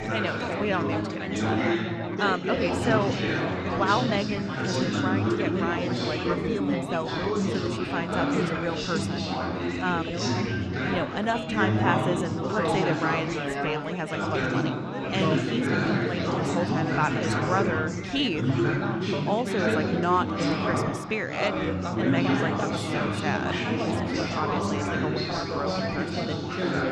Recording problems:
chatter from many people; very loud; throughout; 3 dB above the speech

